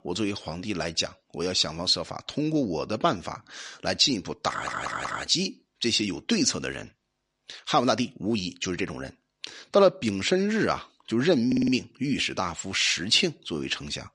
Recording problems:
audio stuttering; at 4.5 s and at 11 s

